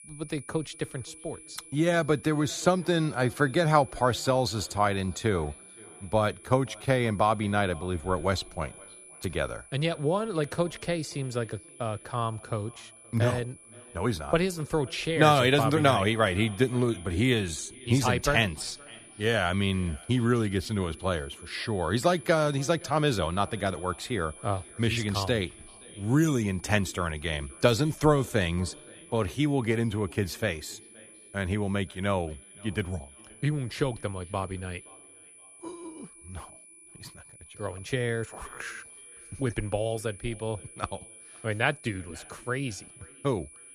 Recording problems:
echo of what is said; faint; throughout; 520 ms later, 25 dB below the speech
high-pitched whine; noticeable; throughout; 10 kHz, 20 dB below the speech

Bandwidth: 14.5 kHz